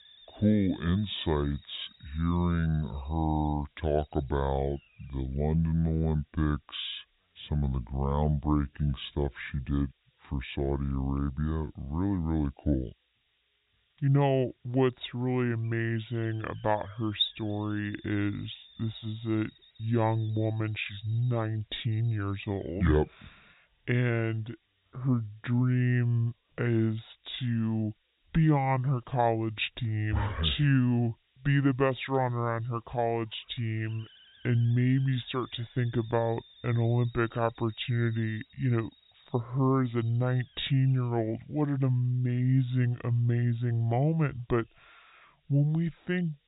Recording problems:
high frequencies cut off; severe; nothing above 4 kHz
wrong speed and pitch; too slow and too low; 0.7 times normal speed
hiss; faint; throughout; 25 dB below the speech

